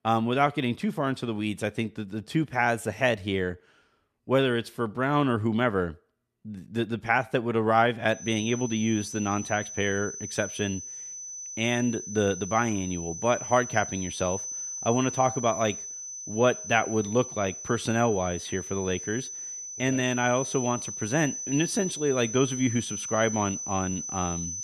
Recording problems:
high-pitched whine; loud; from 8 s on; 6 kHz, 7 dB below the speech

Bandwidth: 14 kHz